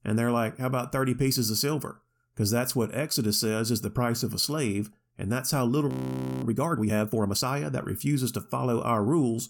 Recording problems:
audio freezing; at 6 s for 0.5 s

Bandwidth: 17.5 kHz